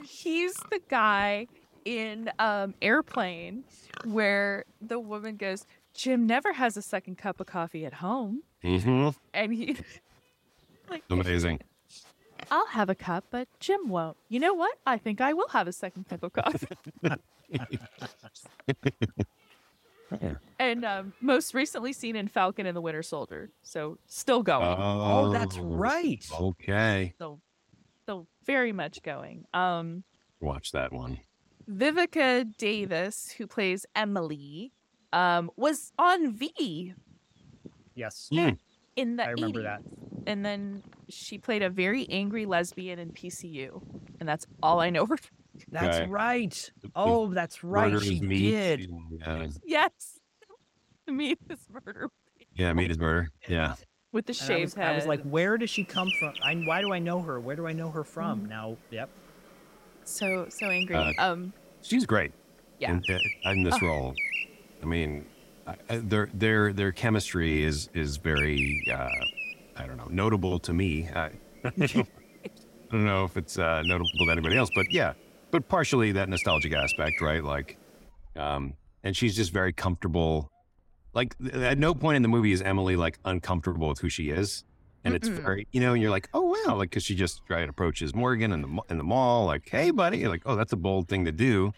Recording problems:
animal sounds; loud; throughout; 2 dB below the speech

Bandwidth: 16 kHz